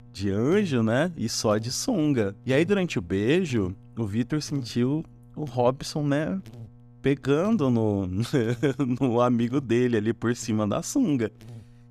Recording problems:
electrical hum; faint; throughout; 60 Hz, 30 dB below the speech

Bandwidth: 14.5 kHz